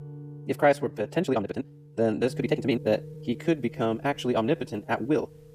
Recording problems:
wrong speed, natural pitch; too fast; 1.5 times normal speed
background music; noticeable; throughout; 15 dB below the speech
uneven, jittery; strongly; from 0.5 to 5 s

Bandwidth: 14.5 kHz